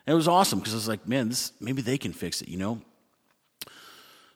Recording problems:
none

